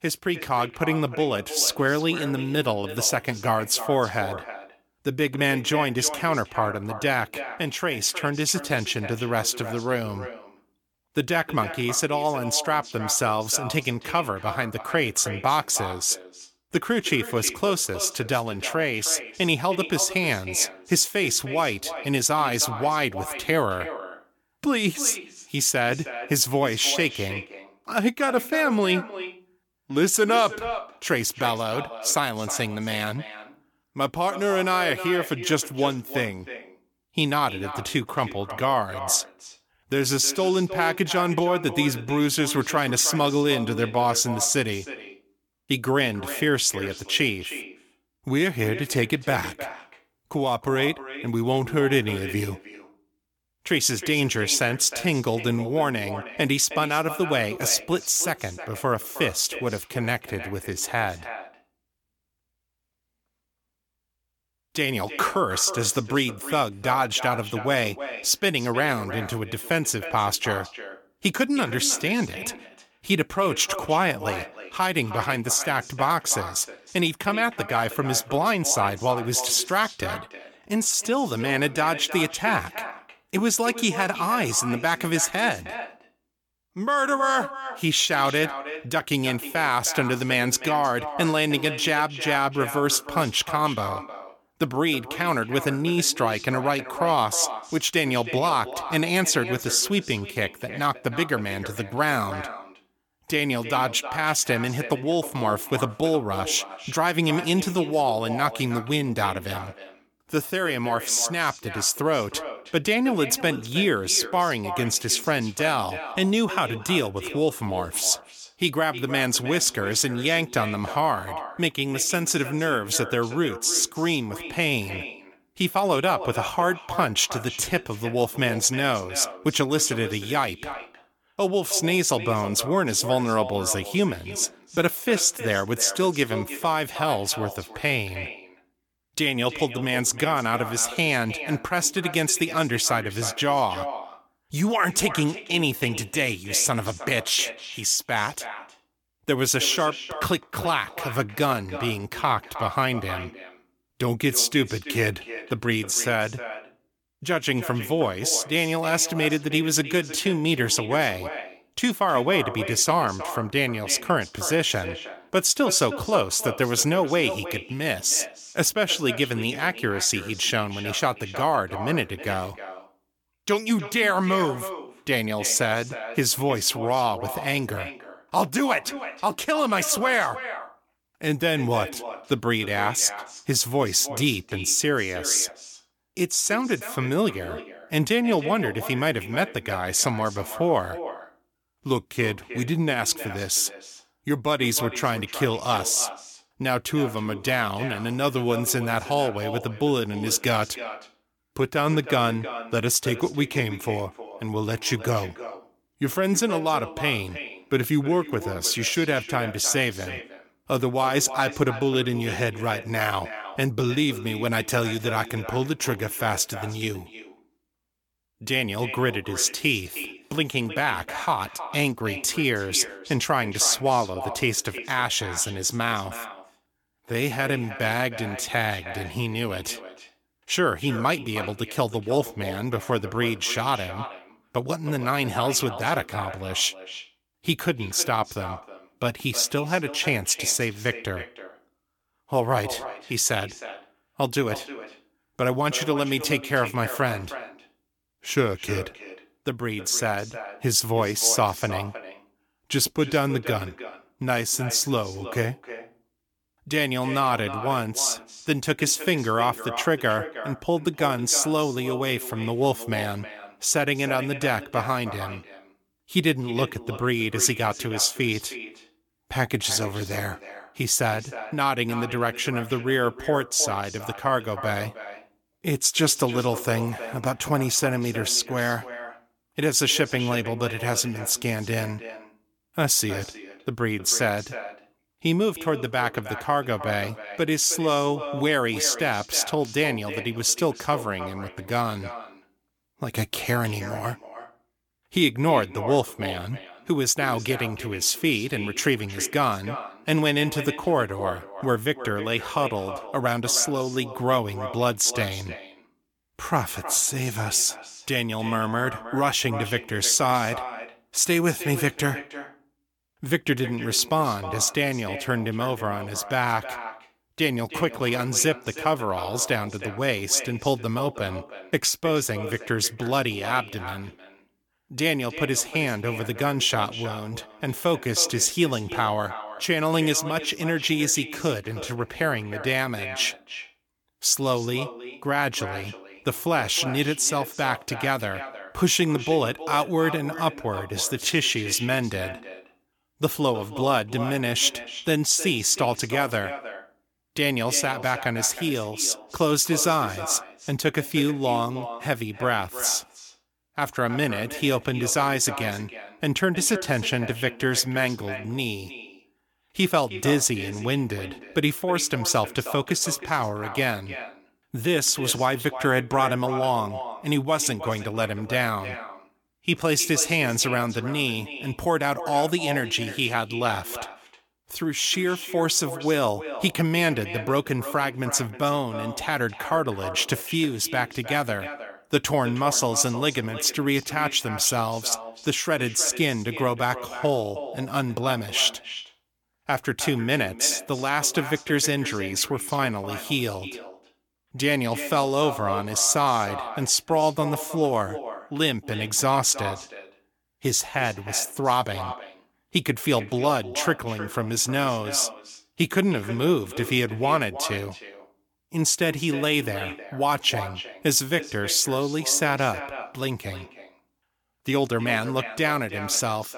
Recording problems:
echo of what is said; noticeable; throughout; 310 ms later, 15 dB below the speech

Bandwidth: 18 kHz